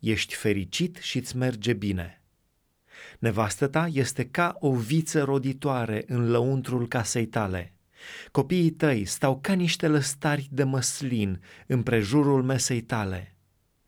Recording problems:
none

